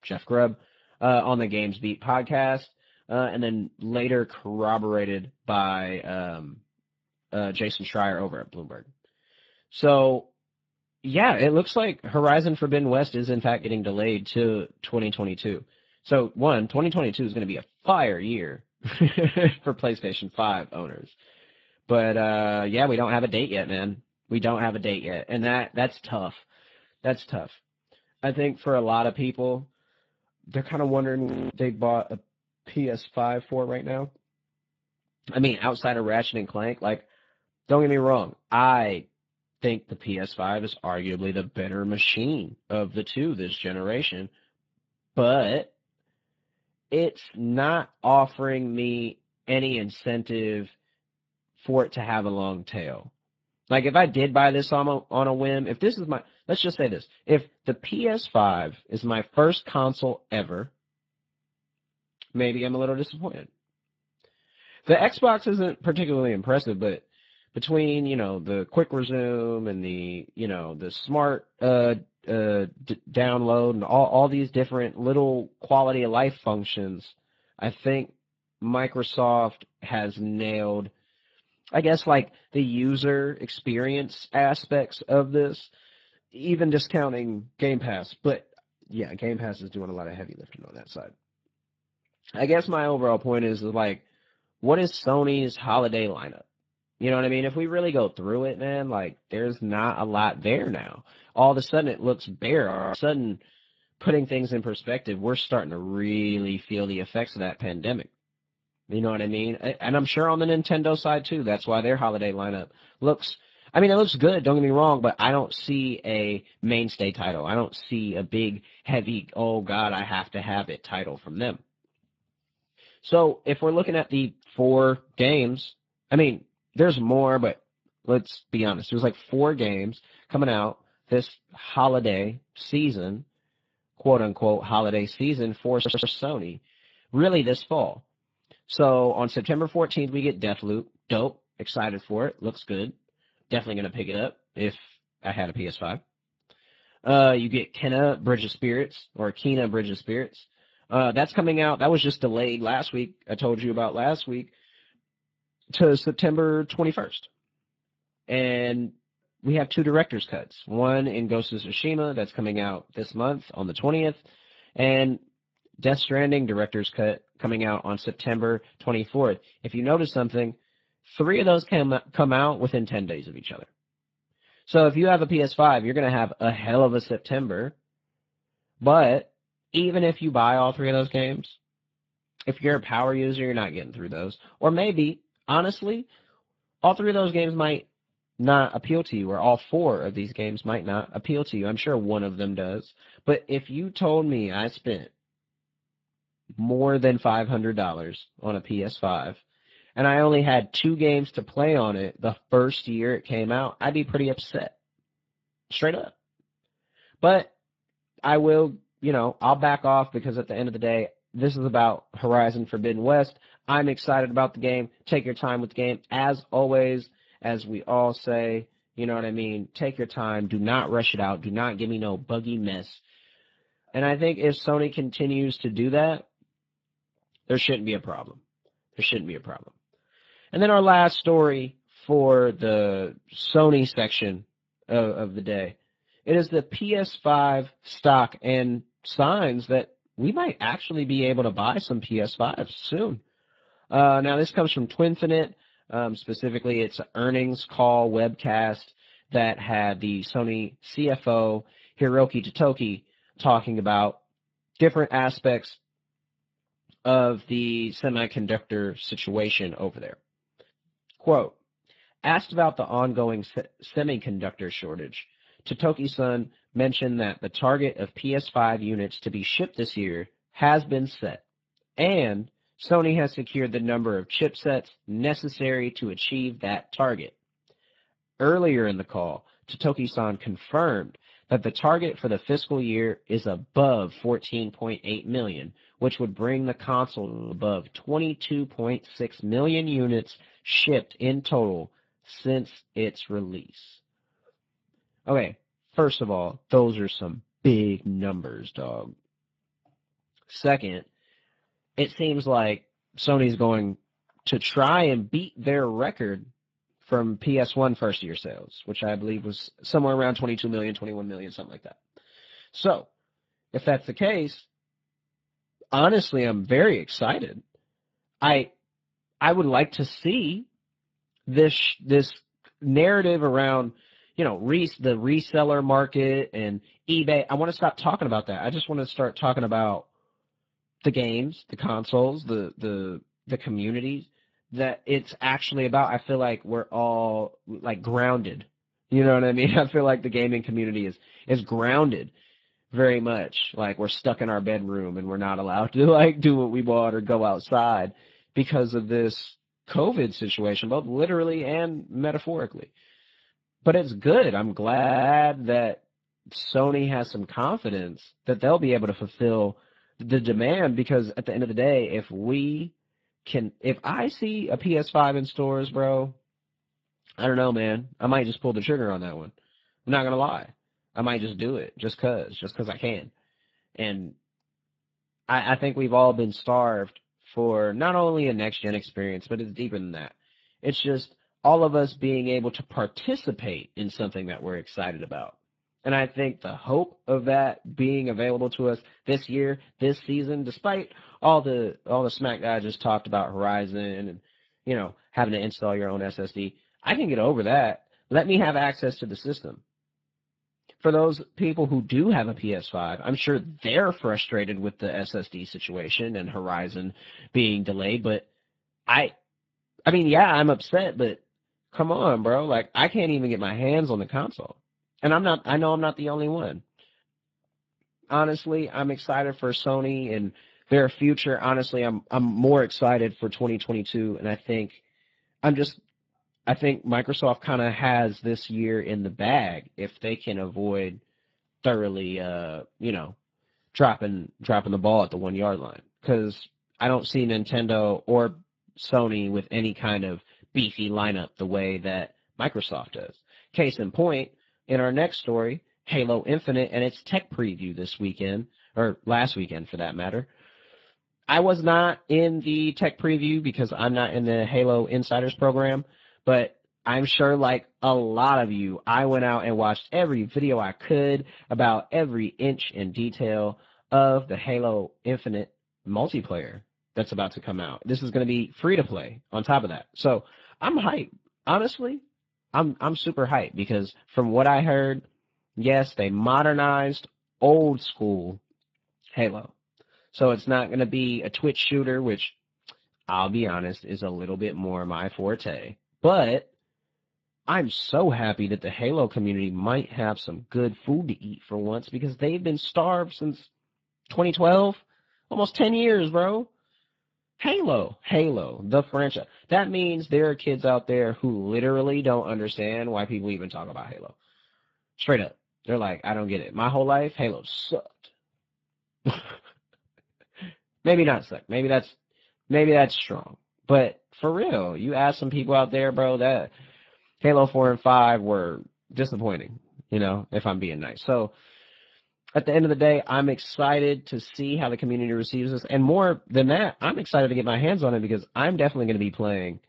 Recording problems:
garbled, watery; badly
audio freezing; at 31 s, at 1:43 and at 4:47
audio stuttering; at 2:16 and at 5:55

